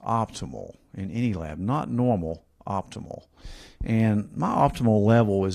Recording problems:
garbled, watery; slightly; nothing above 14.5 kHz
abrupt cut into speech; at the end

